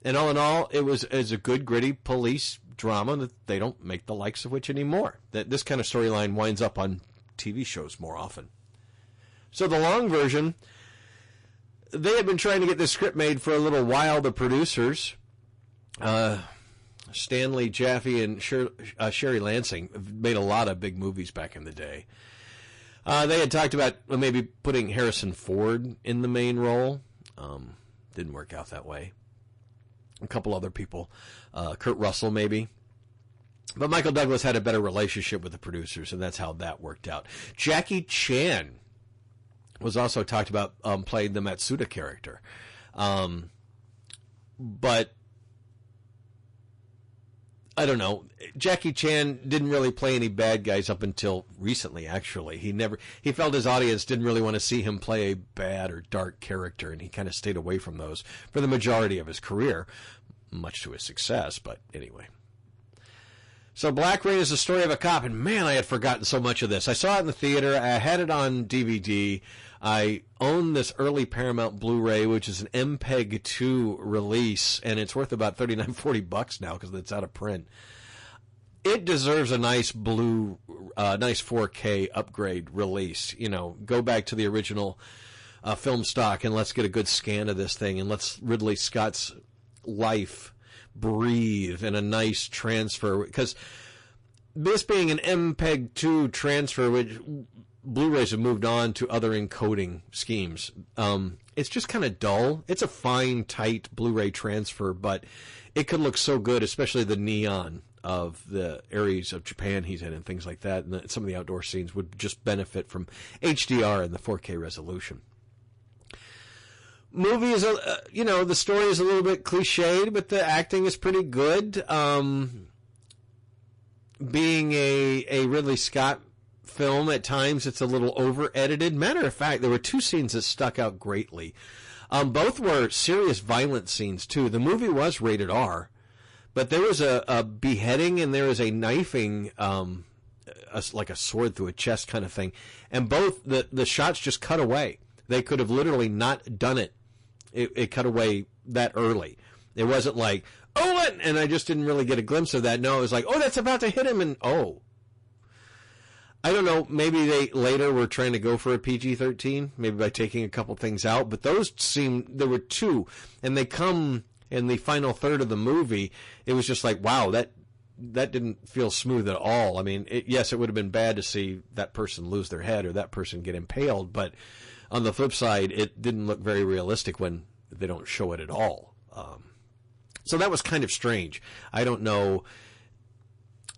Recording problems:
distortion; heavy; 9% of the sound clipped
garbled, watery; slightly; nothing above 10.5 kHz

